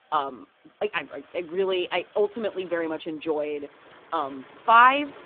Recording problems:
phone-call audio; poor line
traffic noise; faint; throughout; 25 dB below the speech

